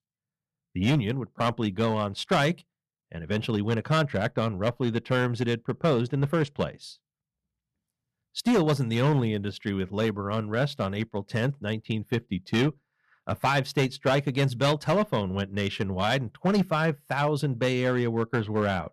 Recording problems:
distortion; slight; 5% of the sound clipped

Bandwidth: 13.5 kHz